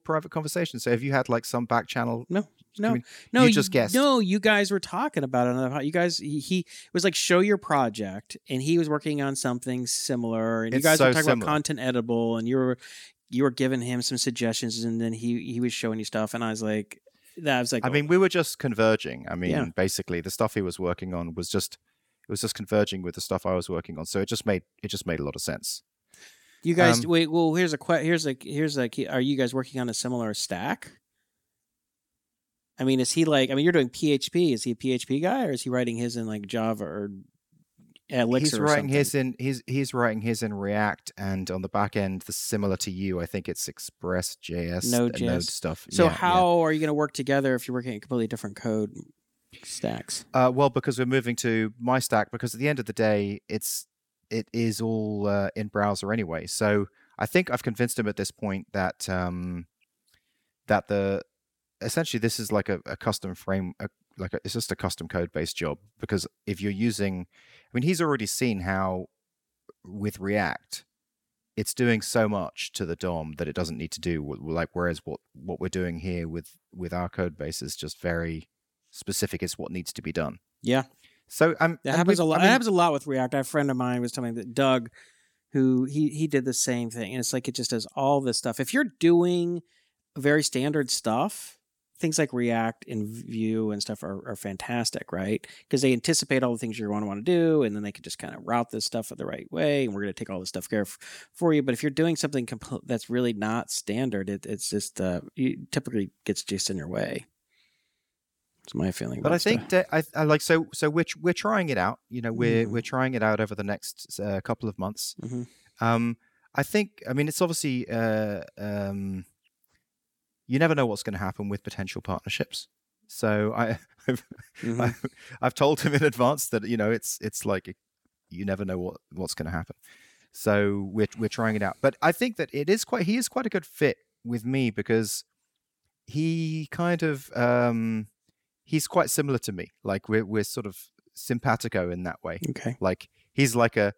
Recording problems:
none

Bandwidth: 17.5 kHz